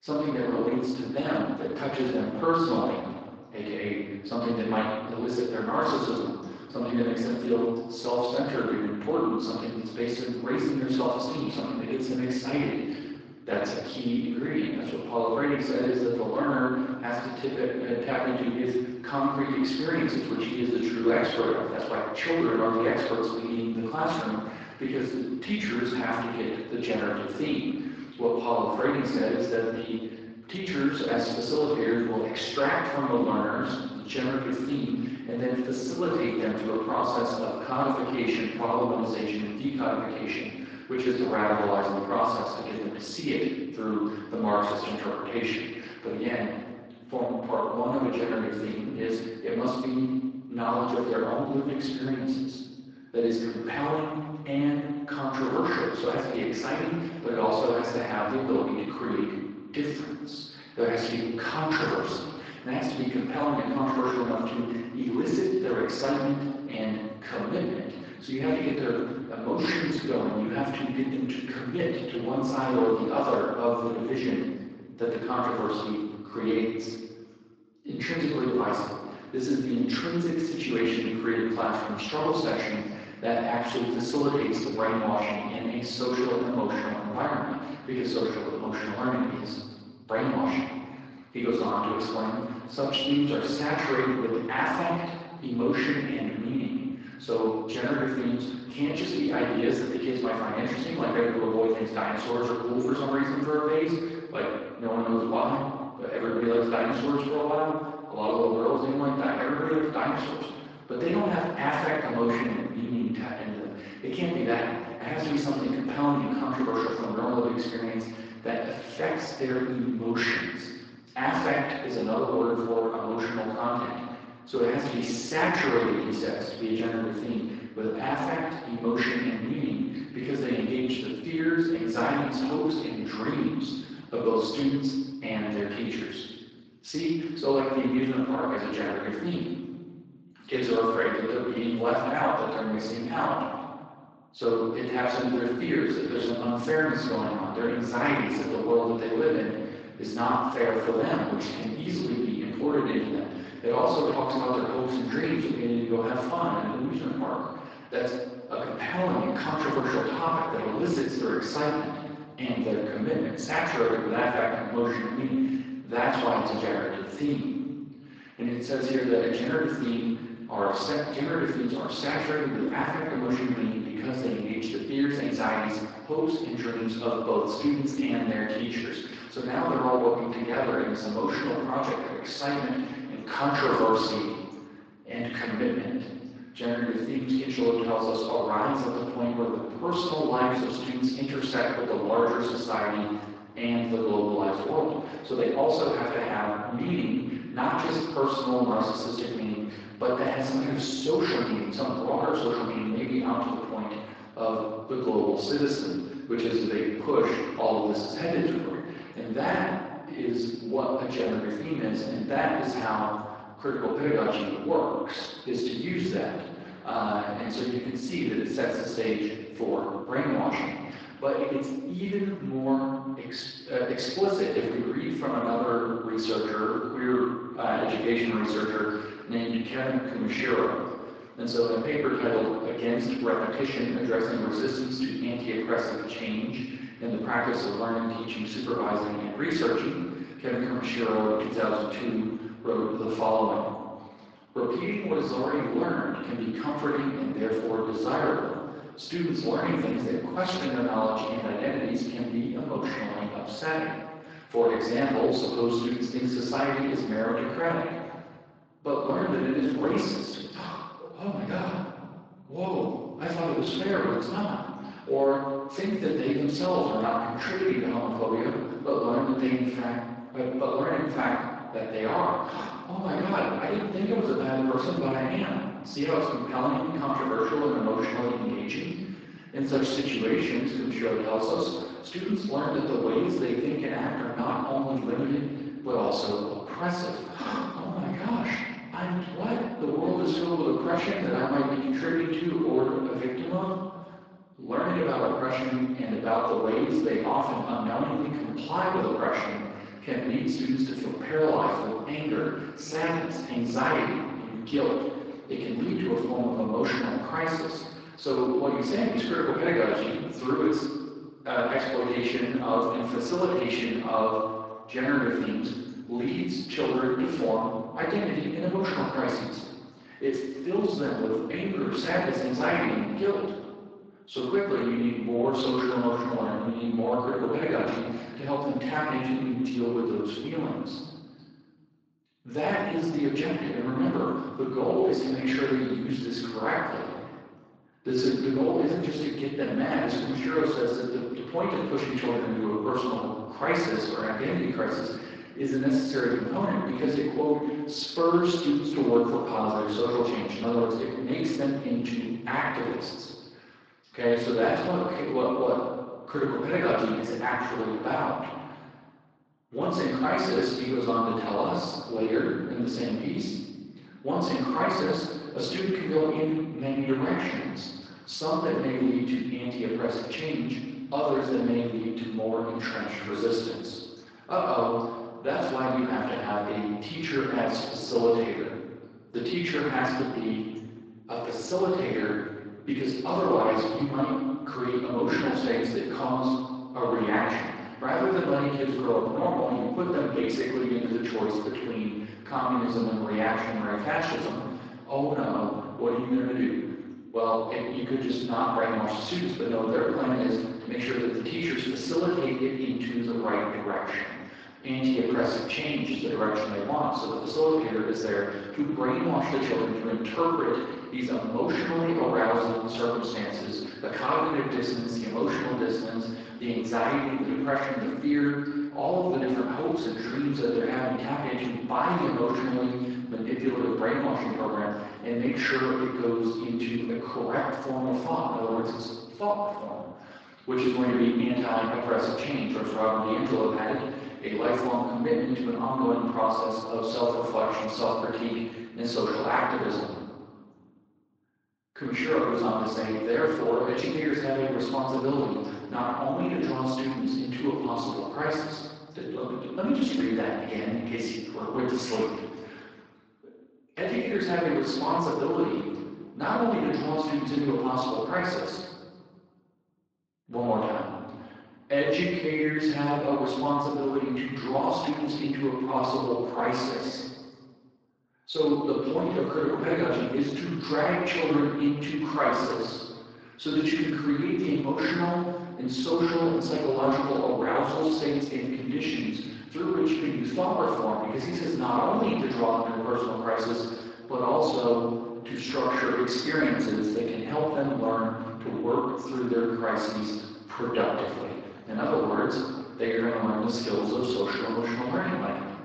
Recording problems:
room echo; strong; dies away in 1.3 s
off-mic speech; far
garbled, watery; slightly; nothing above 7.5 kHz
thin; very slightly; fading below 300 Hz

